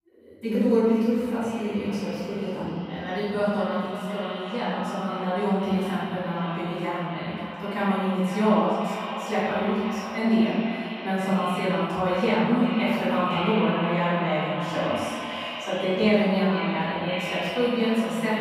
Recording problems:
echo of what is said; strong; throughout; 520 ms later, 9 dB below the speech
room echo; strong; dies away in 1.4 s
off-mic speech; far

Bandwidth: 15.5 kHz